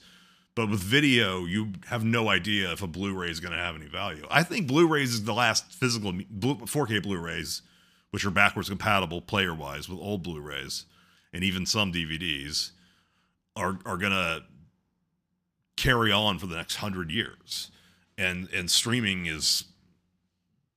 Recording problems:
none

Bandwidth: 15 kHz